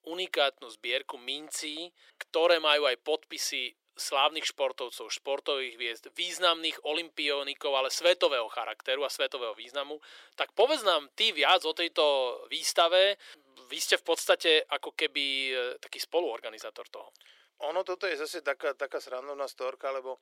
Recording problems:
thin; very; fading below 400 Hz

